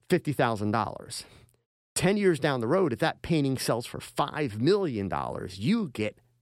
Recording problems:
none

